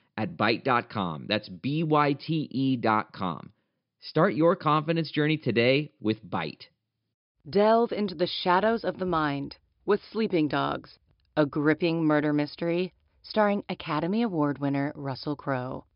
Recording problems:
high frequencies cut off; noticeable; nothing above 5.5 kHz

